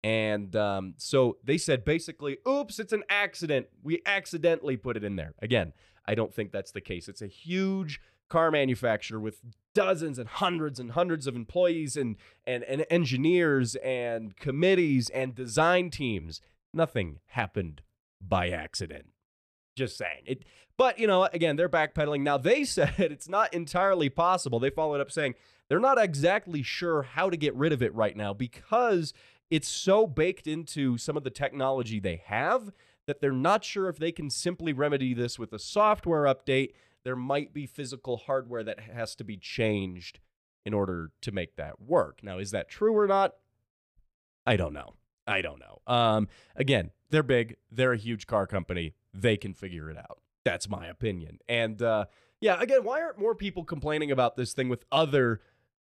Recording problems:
none

